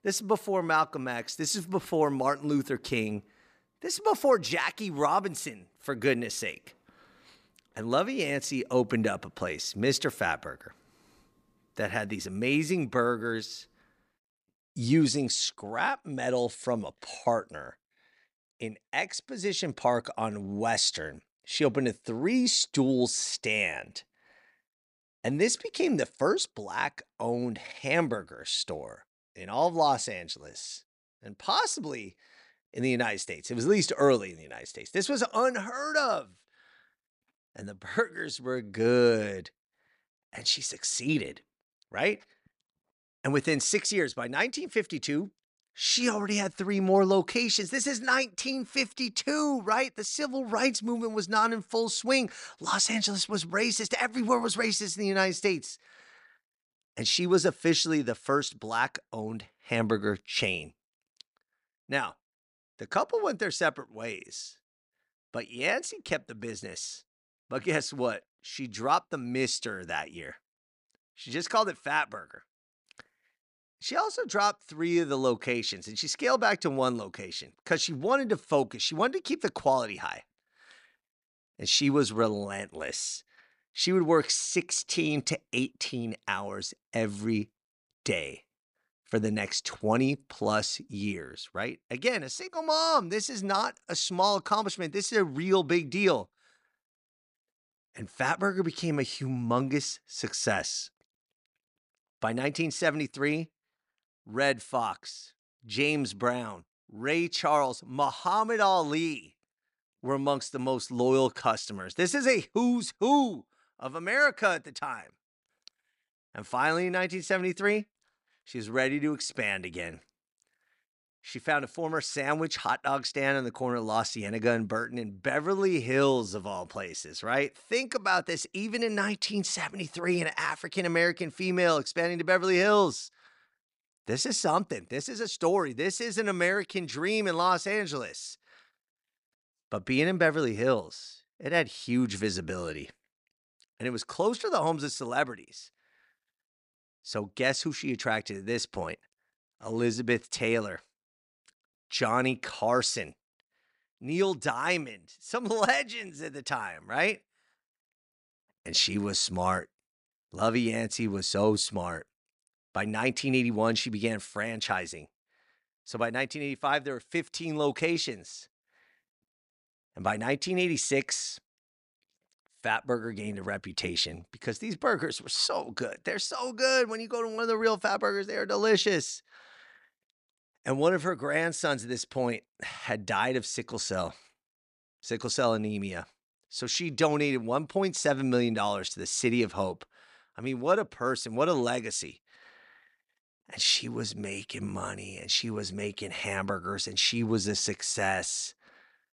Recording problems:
none

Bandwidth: 14.5 kHz